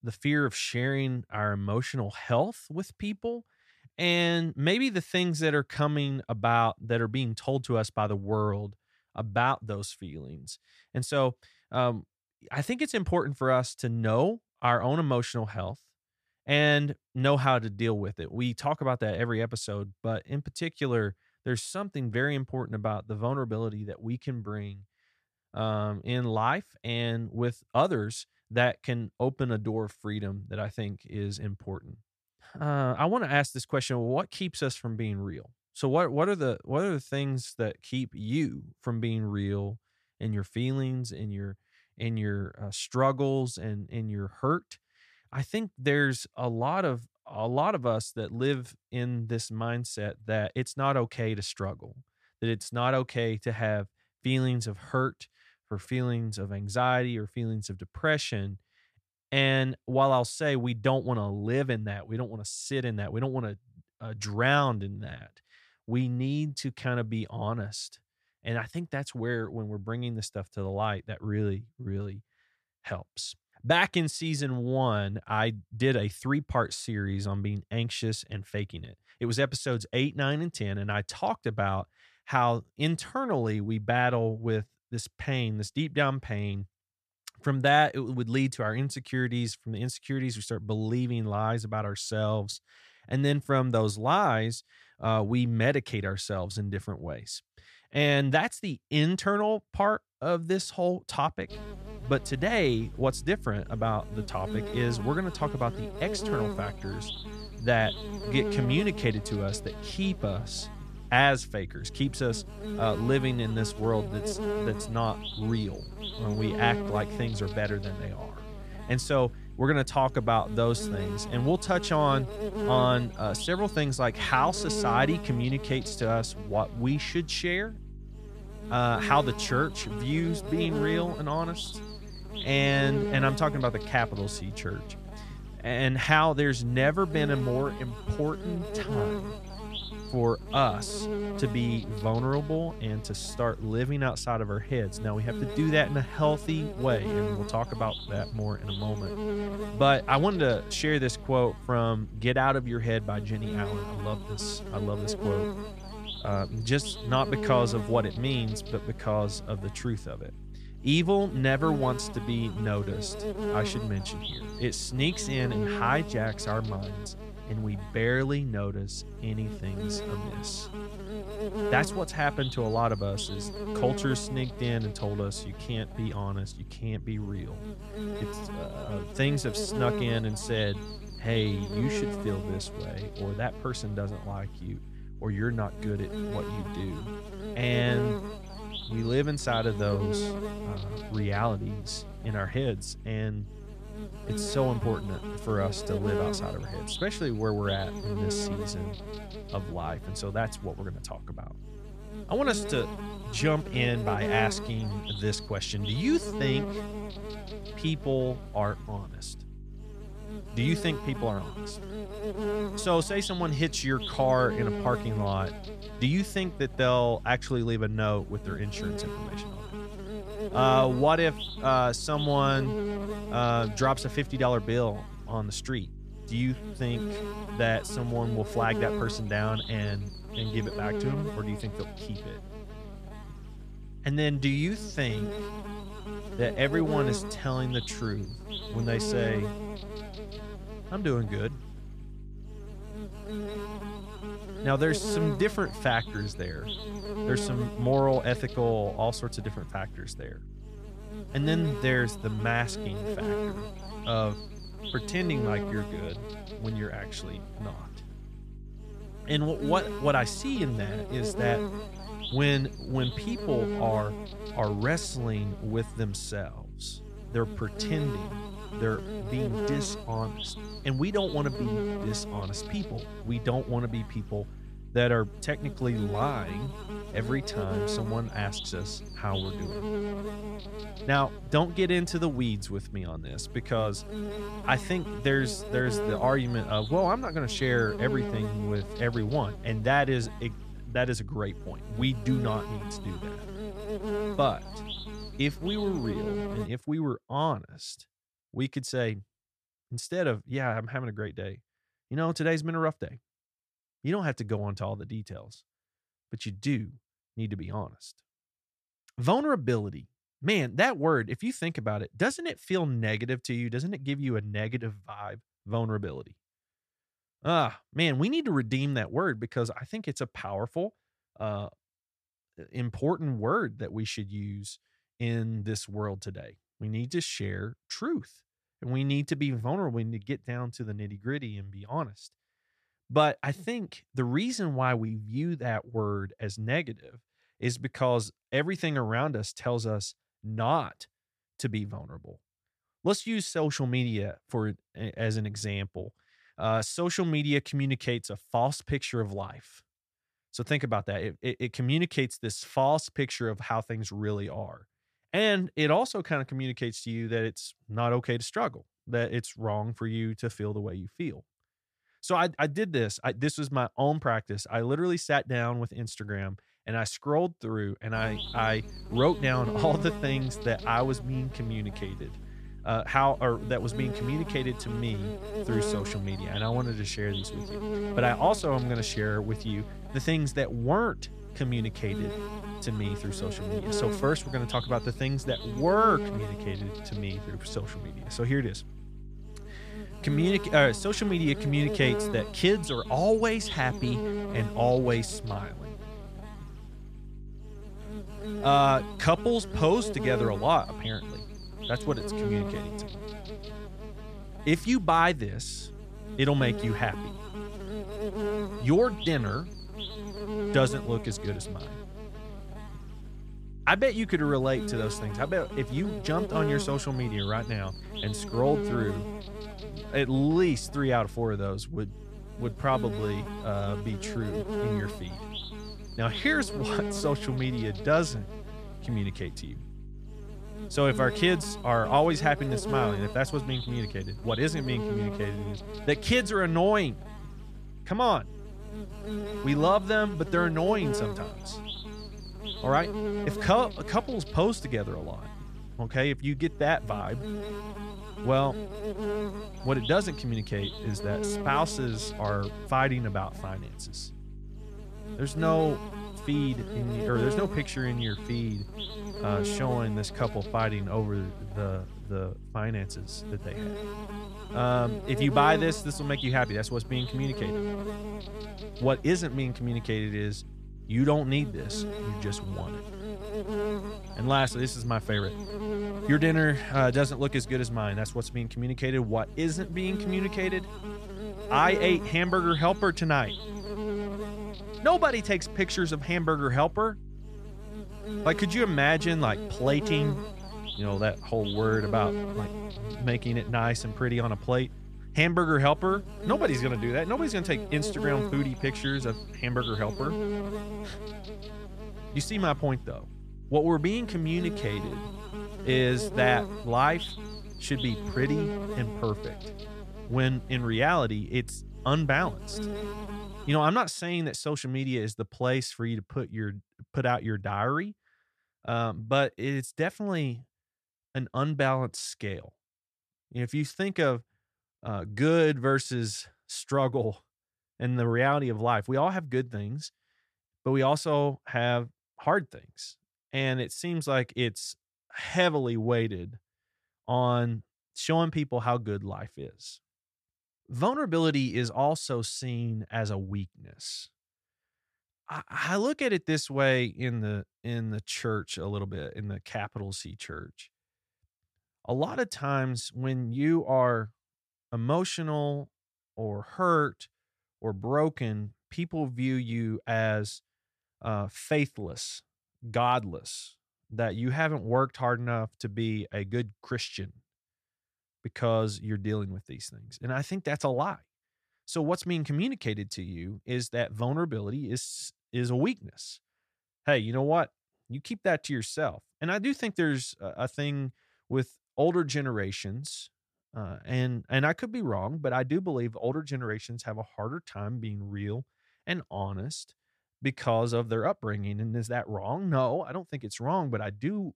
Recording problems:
electrical hum; loud; from 1:42 to 4:57 and from 6:08 to 8:34; 50 Hz, 9 dB below the speech

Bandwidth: 14.5 kHz